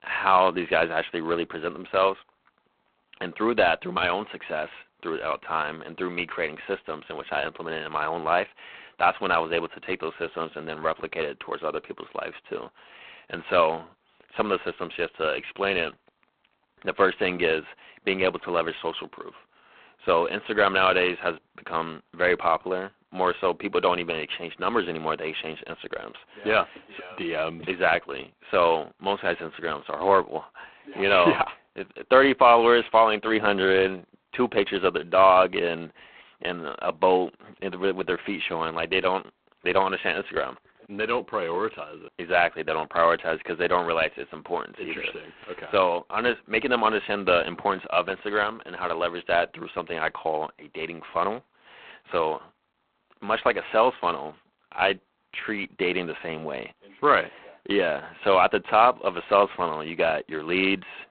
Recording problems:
phone-call audio; poor line; nothing above 3.5 kHz

